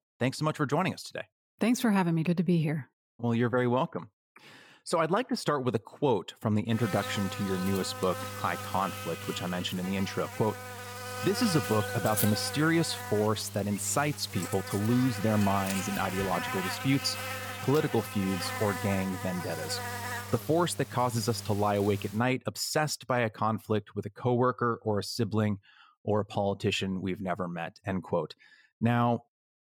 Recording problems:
electrical hum; loud; from 7 to 22 s; 50 Hz, 5 dB below the speech

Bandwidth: 18 kHz